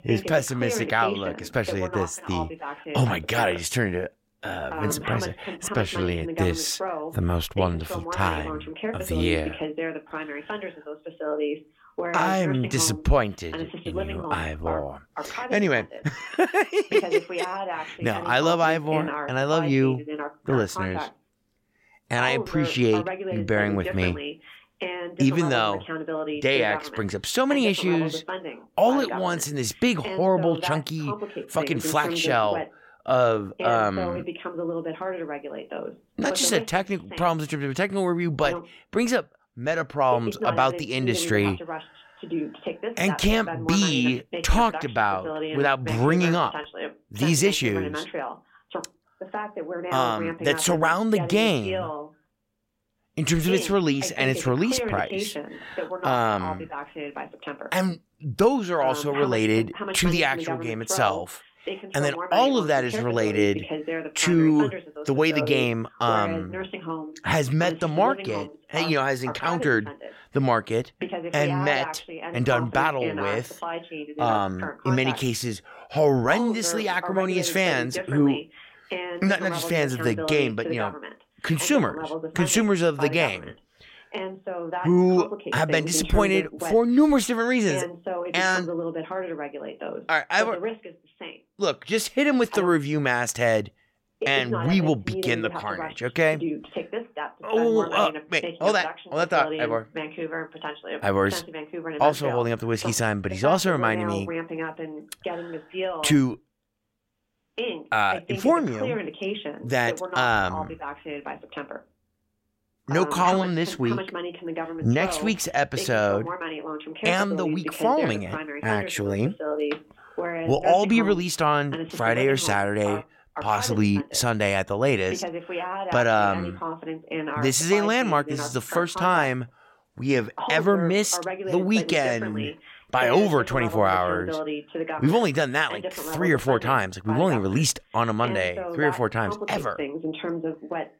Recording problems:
voice in the background; loud; throughout; 9 dB below the speech

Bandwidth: 16.5 kHz